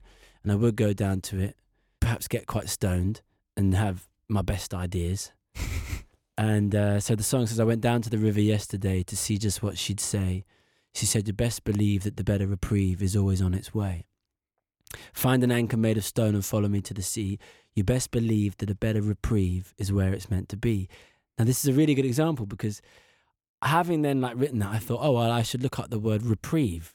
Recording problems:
none

